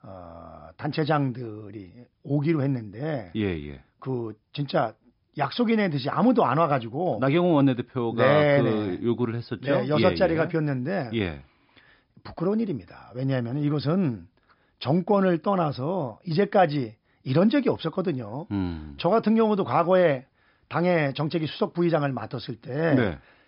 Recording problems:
high frequencies cut off; noticeable; nothing above 5.5 kHz

